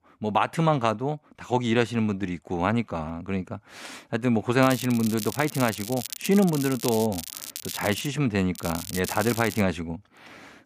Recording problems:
crackling; loud; from 4.5 to 8 s and from 8.5 to 9.5 s; 10 dB below the speech

